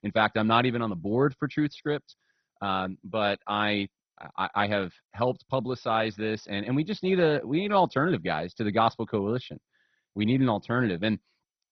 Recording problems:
garbled, watery; badly; nothing above 6 kHz

